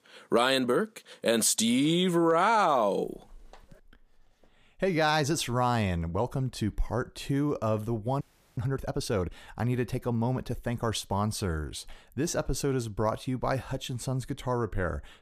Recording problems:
audio freezing; at 8 s

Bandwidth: 14.5 kHz